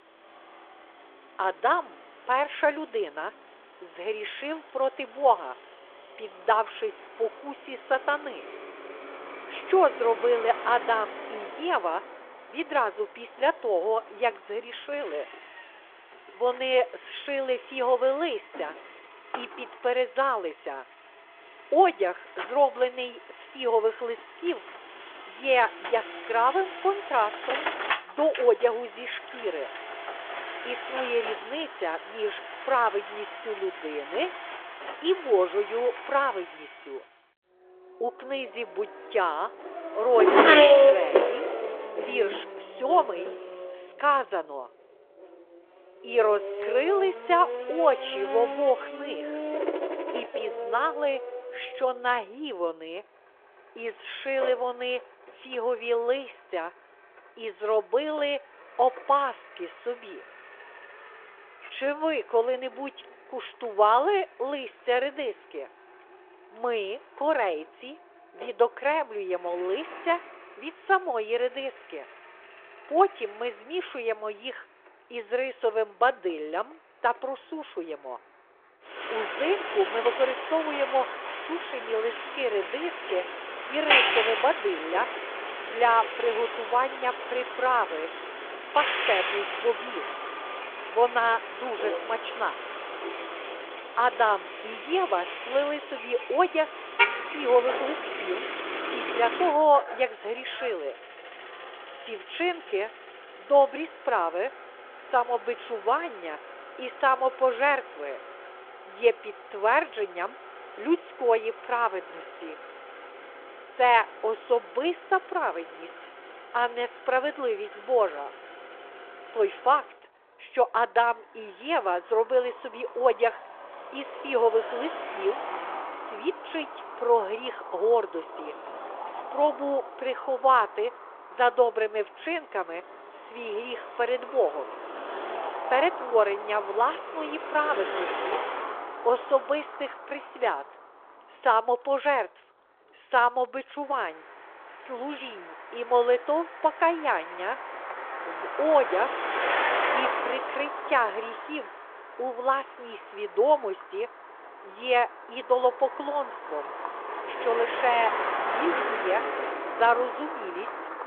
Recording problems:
phone-call audio
traffic noise; loud; throughout; 4 dB below the speech

